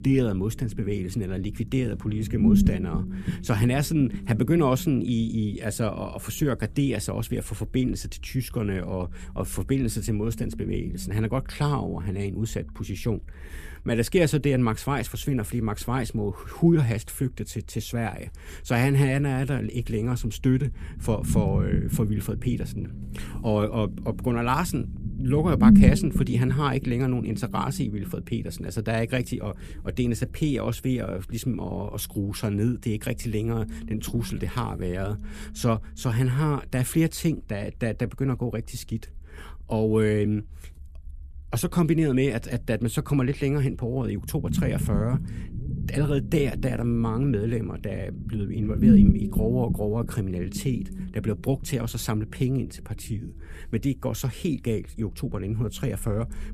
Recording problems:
low rumble; loud; throughout; 4 dB below the speech

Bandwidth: 14.5 kHz